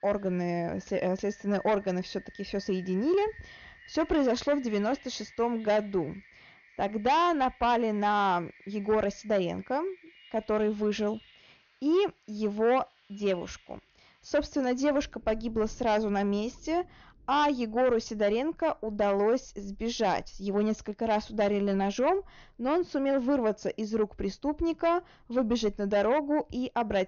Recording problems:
high frequencies cut off; noticeable; nothing above 6.5 kHz
distortion; slight; 10 dB below the speech
rain or running water; faint; throughout; 25 dB below the speech

